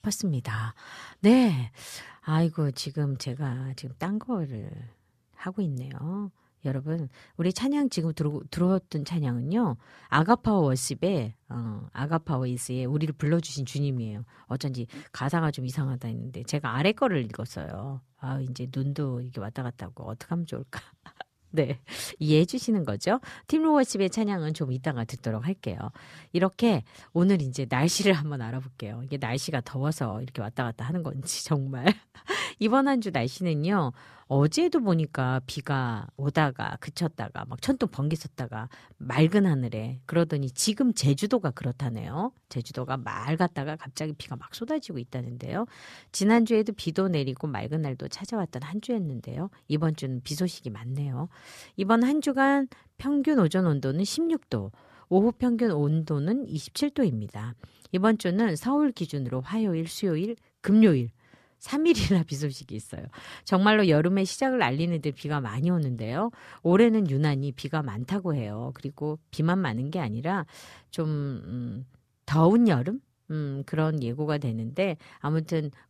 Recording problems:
none

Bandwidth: 14.5 kHz